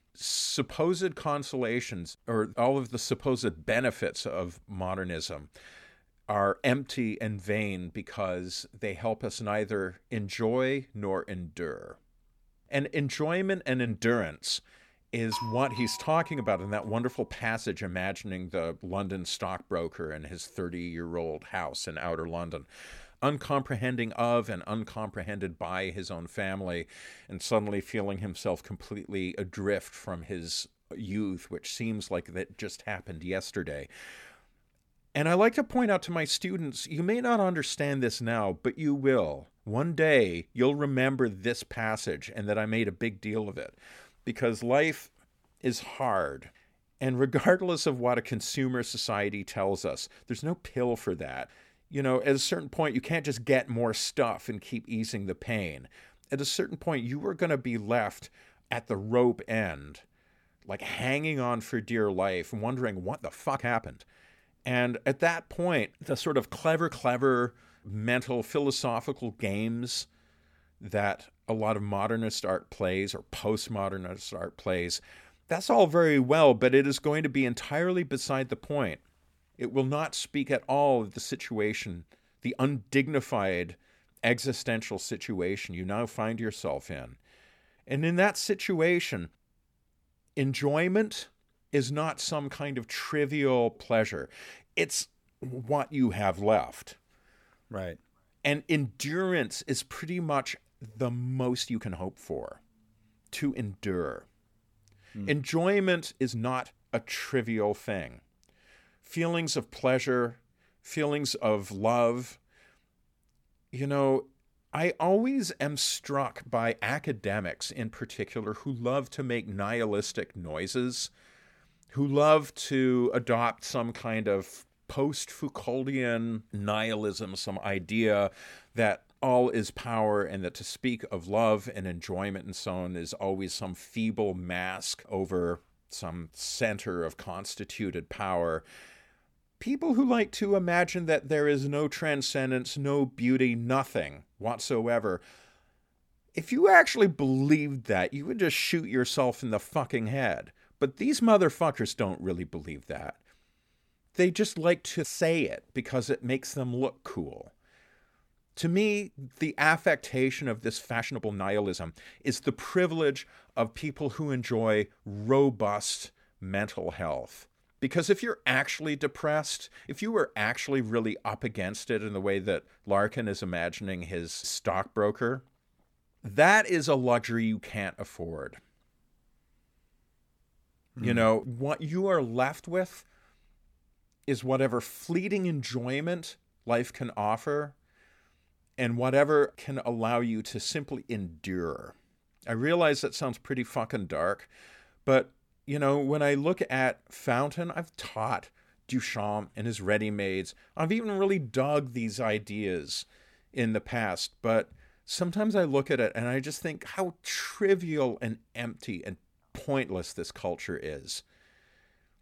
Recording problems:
doorbell; noticeable; from 15 to 17 s; peak 6 dB below the speech
uneven, jittery; strongly; from 31 s to 3:28

